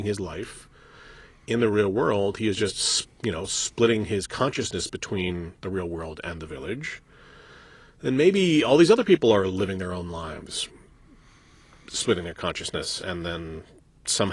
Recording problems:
garbled, watery; slightly
abrupt cut into speech; at the start and the end

